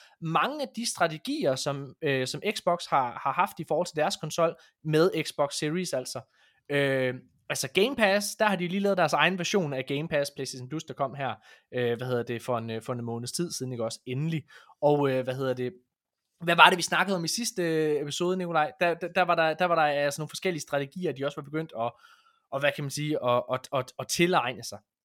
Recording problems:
none

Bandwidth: 17 kHz